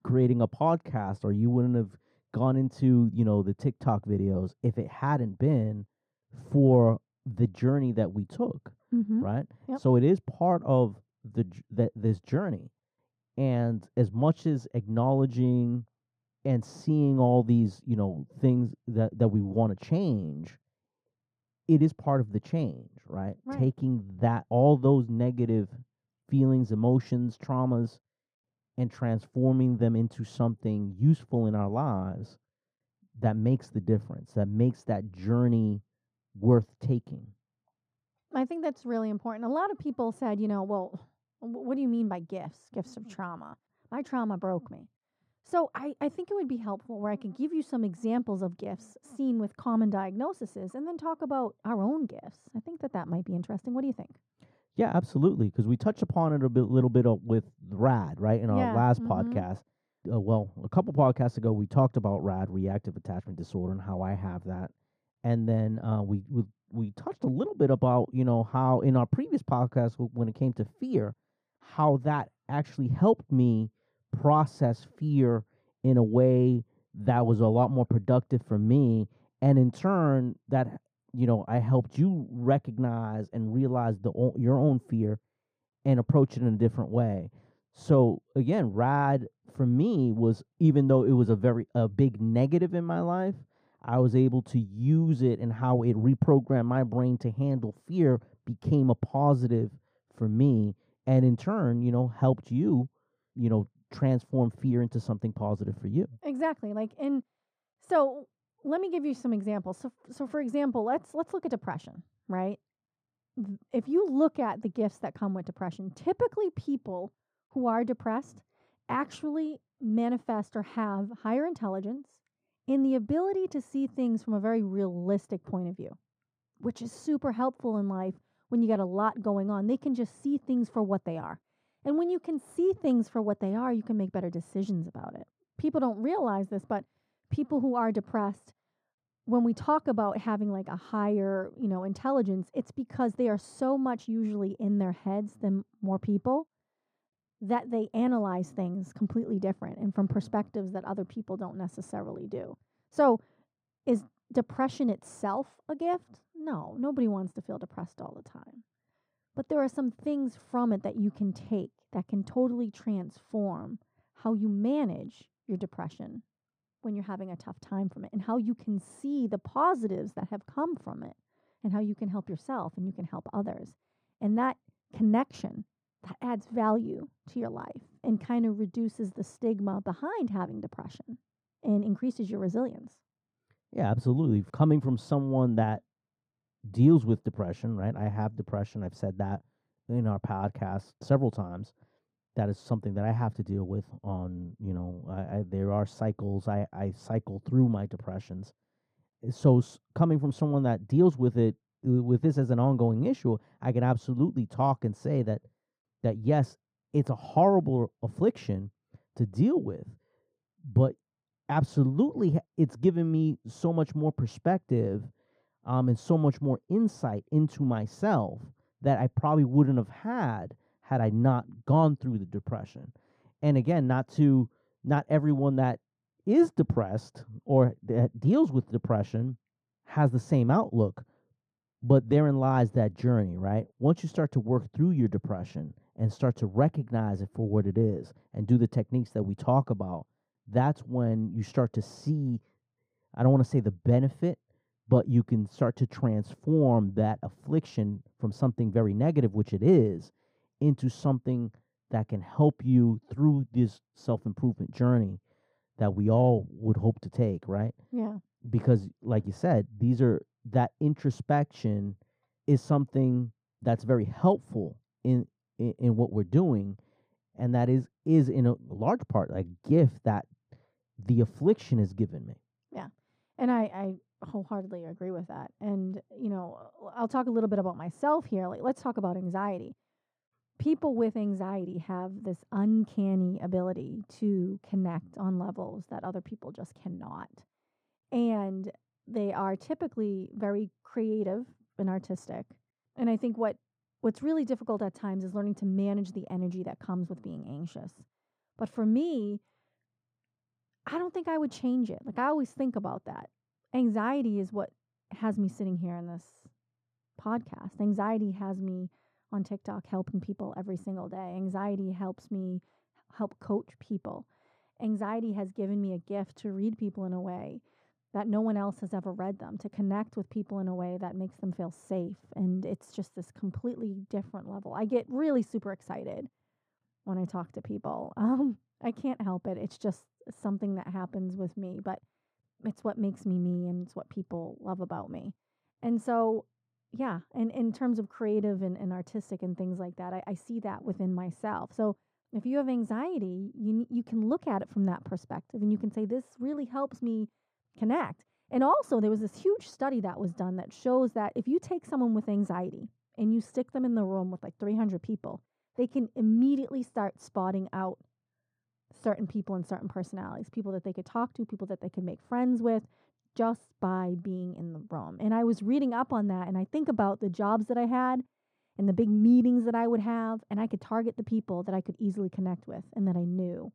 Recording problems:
muffled; very; fading above 2 kHz

